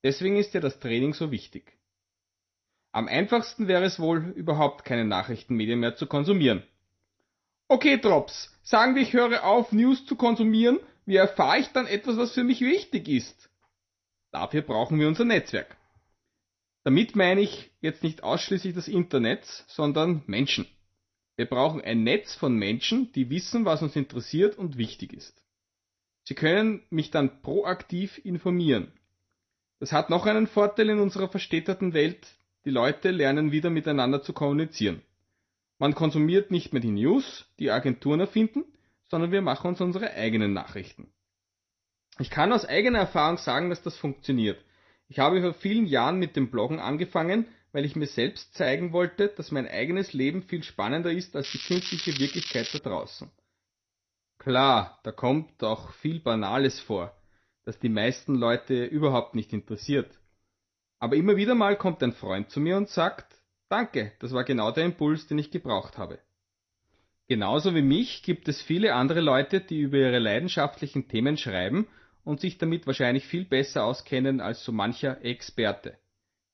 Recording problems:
garbled, watery; slightly; nothing above 6 kHz
crackling; loud; from 51 to 53 s; 7 dB below the speech
uneven, jittery; slightly; from 5.5 s to 1:13

